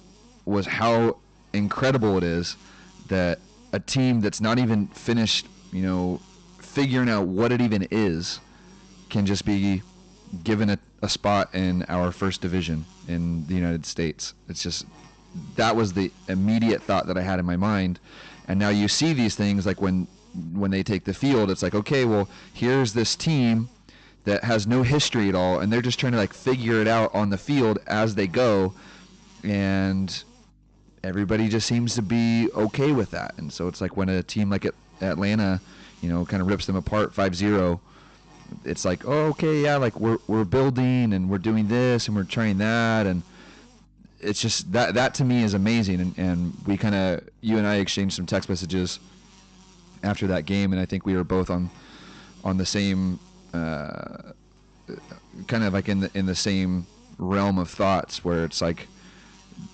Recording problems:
high frequencies cut off; noticeable; nothing above 8 kHz
distortion; slight; 7% of the sound clipped
electrical hum; faint; throughout; 50 Hz, 25 dB below the speech

